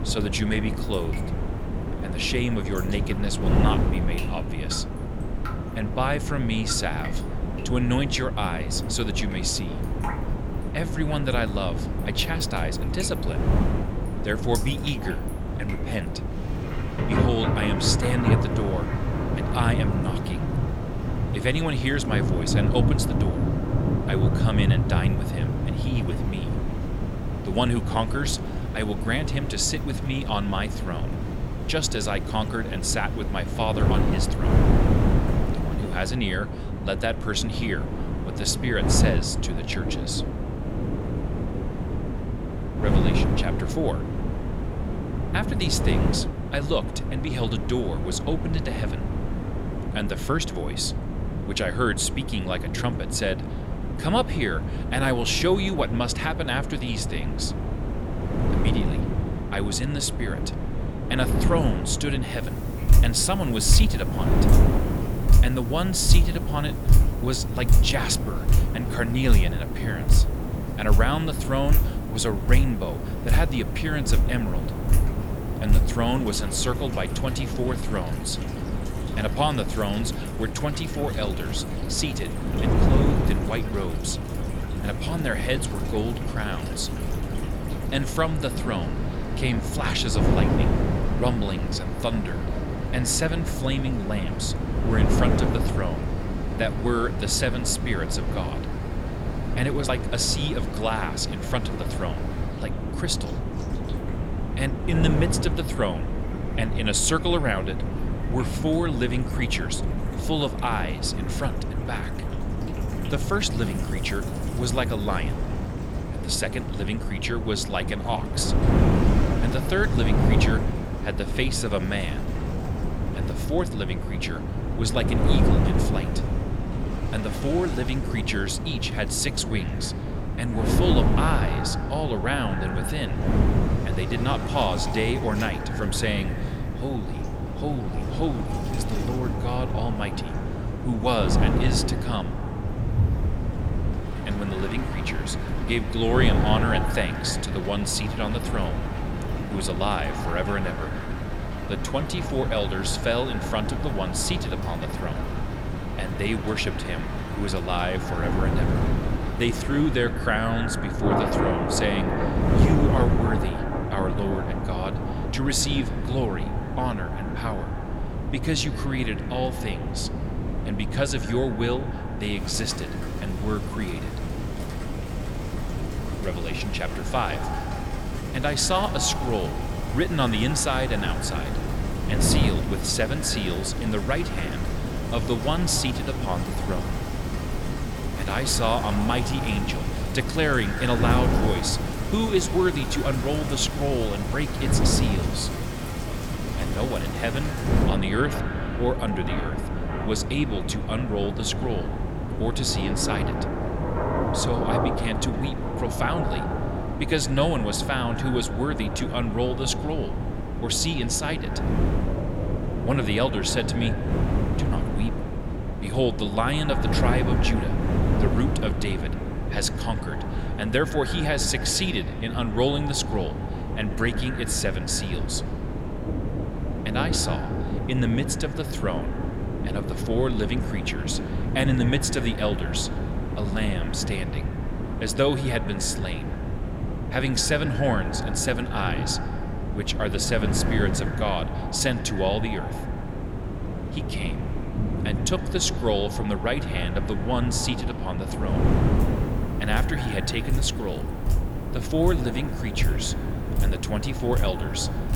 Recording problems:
echo of what is said; noticeable; from 2:09 on; 110 ms later, 15 dB below the speech
wind noise on the microphone; heavy; 7 dB below the speech
rain or running water; loud; throughout; 5 dB below the speech

